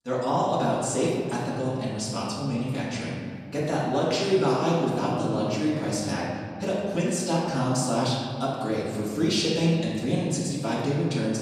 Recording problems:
off-mic speech; far
room echo; noticeable; dies away in 2 s

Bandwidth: 15.5 kHz